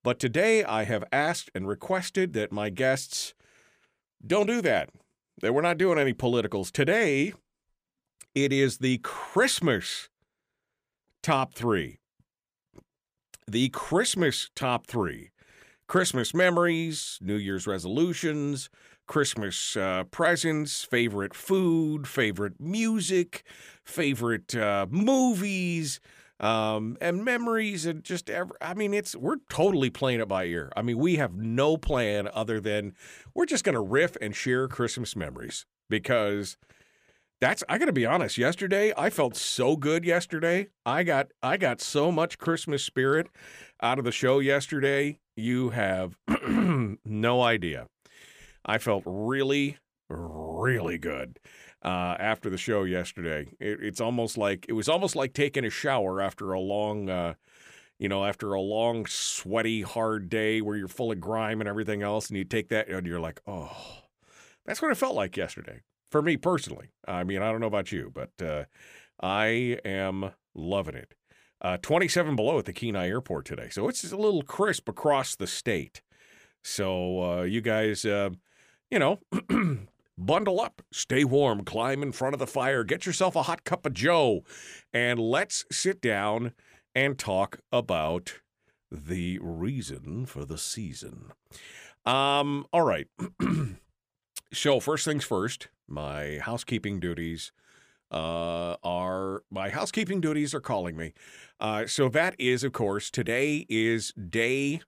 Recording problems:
none

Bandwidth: 15 kHz